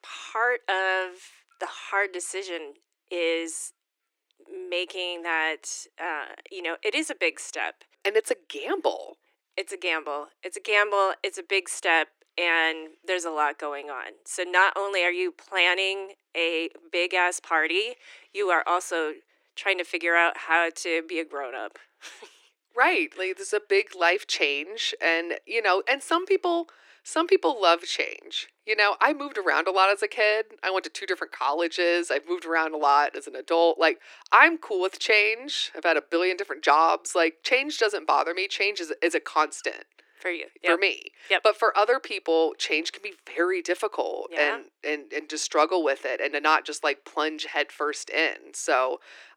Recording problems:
thin; very; fading below 300 Hz

